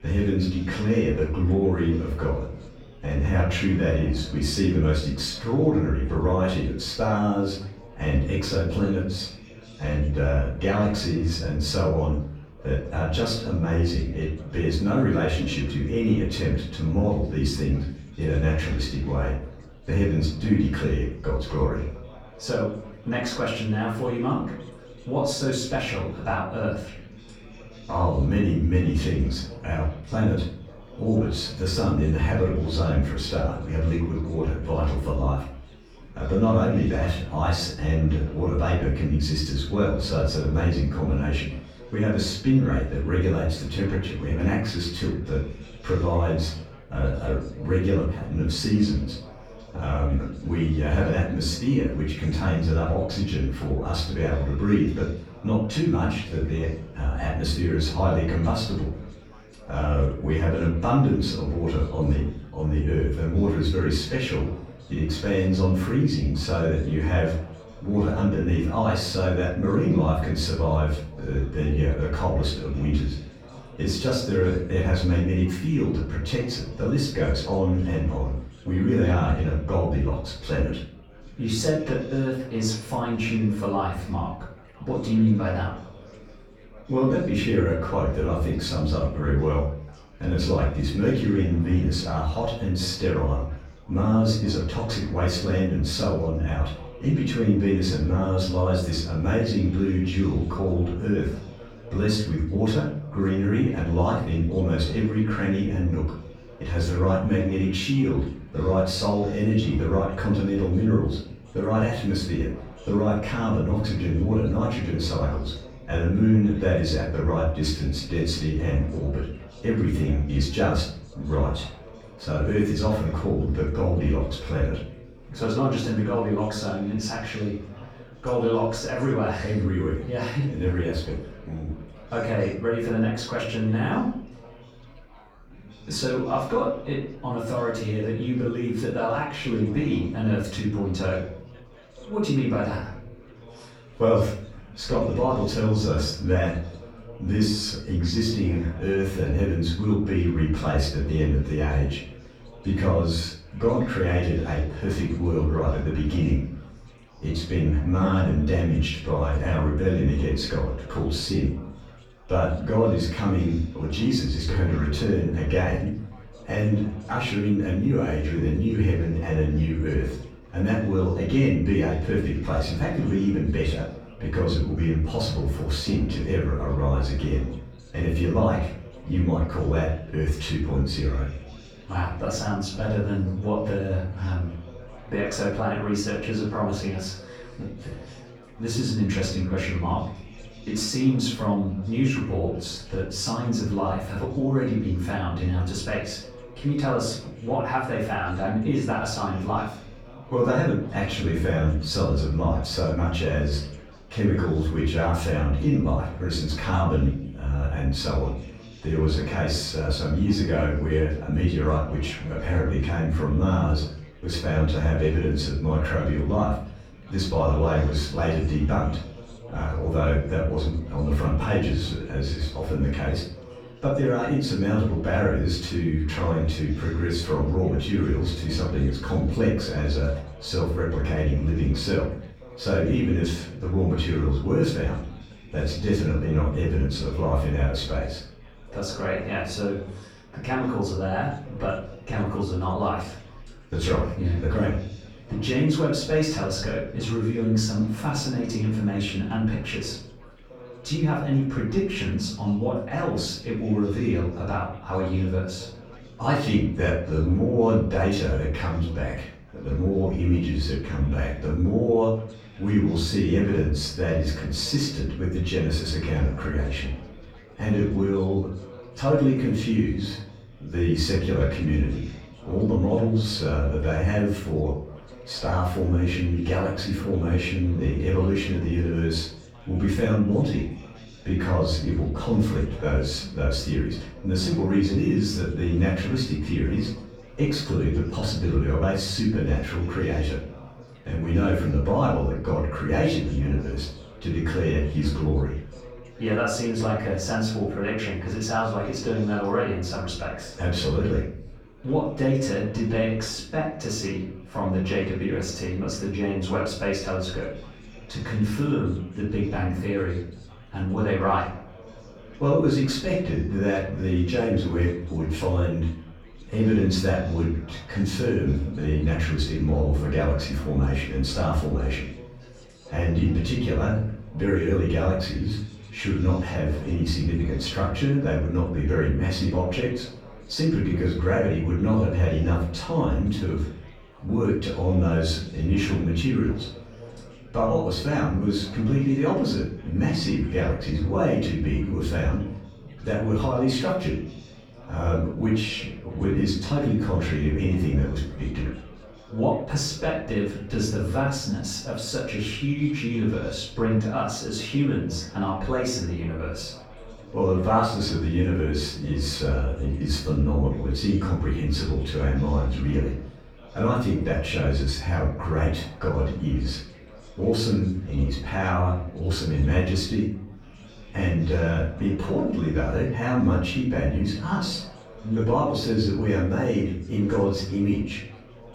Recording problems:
off-mic speech; far
room echo; noticeable; dies away in 0.5 s
chatter from many people; faint; throughout; 20 dB below the speech

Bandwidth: 18.5 kHz